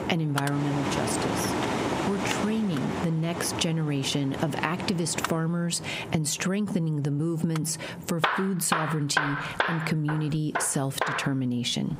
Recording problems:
squashed, flat; heavily, background pumping
machinery noise; loud; throughout; 3 dB below the speech

